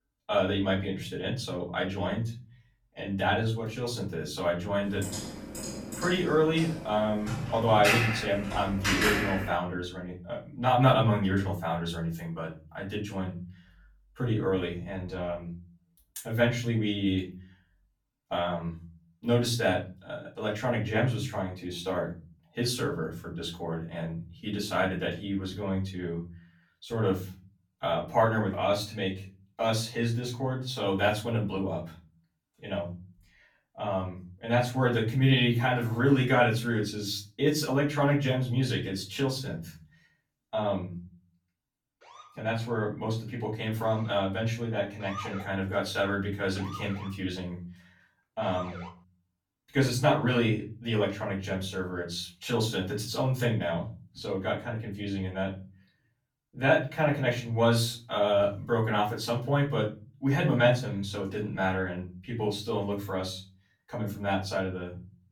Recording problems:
off-mic speech; far
room echo; slight; dies away in 0.5 s
keyboard typing; loud; from 5 to 9.5 s; peak 4 dB above the speech
siren; noticeable; from 42 to 49 s; peak 10 dB below the speech

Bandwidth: 18.5 kHz